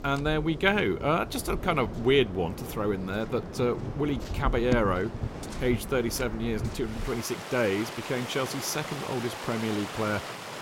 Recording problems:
rain or running water; loud; throughout; 8 dB below the speech

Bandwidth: 16 kHz